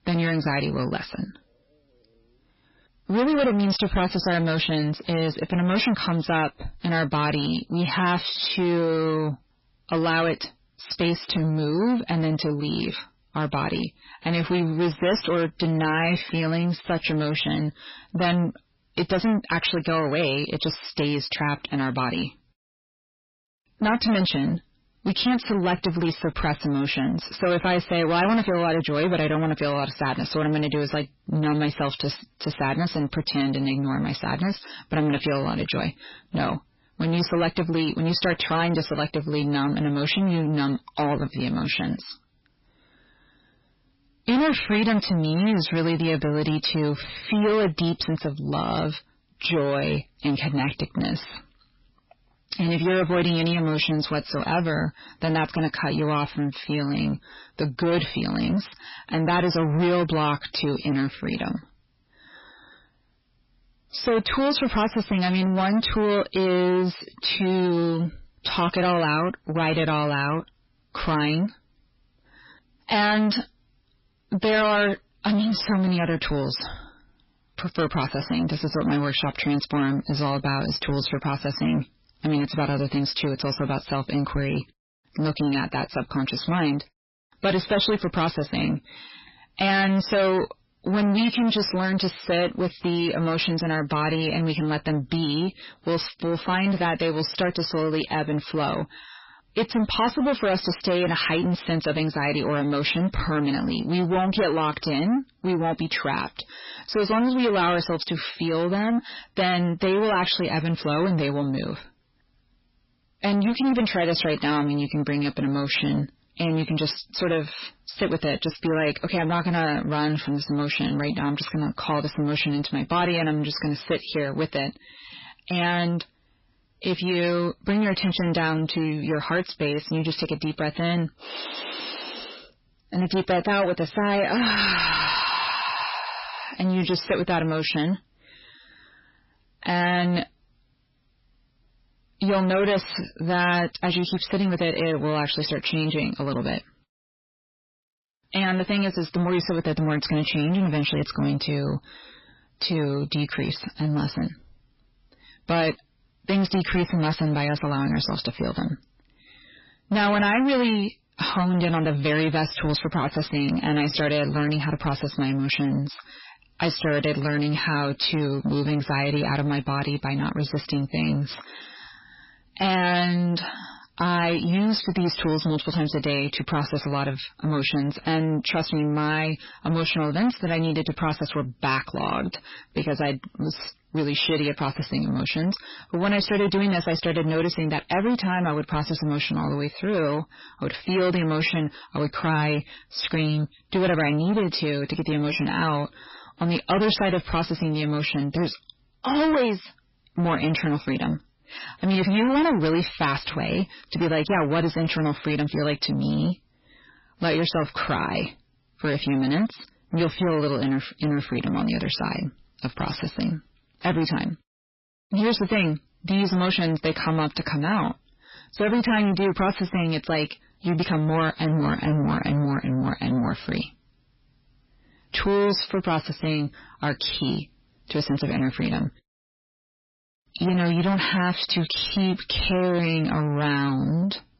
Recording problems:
distortion; heavy; 6 dB below the speech
garbled, watery; badly; nothing above 5.5 kHz

